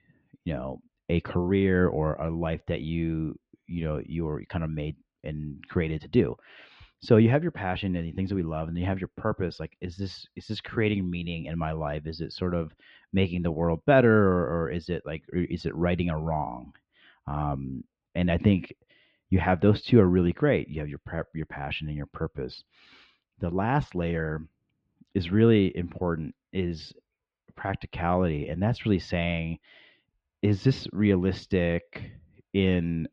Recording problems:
muffled; very; fading above 3 kHz

